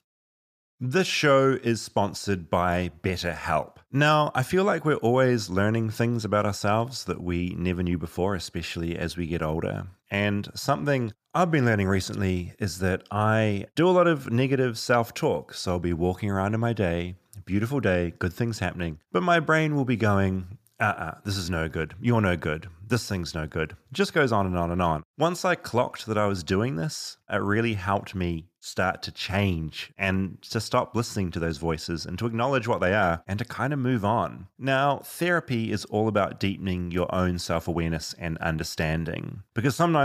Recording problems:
abrupt cut into speech; at the end

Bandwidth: 15 kHz